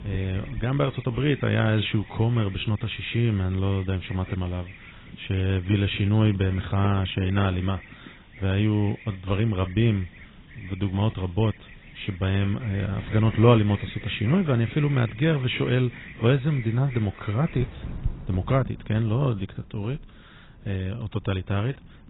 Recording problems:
garbled, watery; badly; nothing above 4 kHz
wind noise on the microphone; occasional gusts; 25 dB below the speech
animal sounds; faint; throughout; 20 dB below the speech

